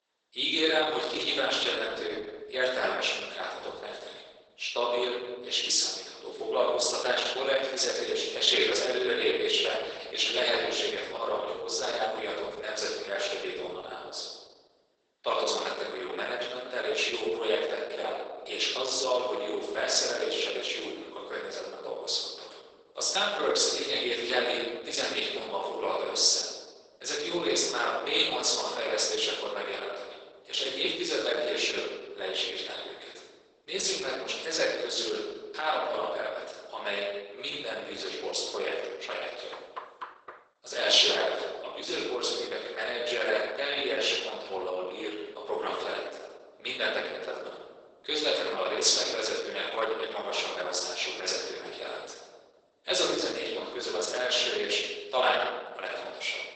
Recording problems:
off-mic speech; far
garbled, watery; badly; nothing above 8 kHz
thin; very; fading below 400 Hz
room echo; noticeable; dies away in 1.2 s
door banging; faint; at 40 s; peak 10 dB below the speech

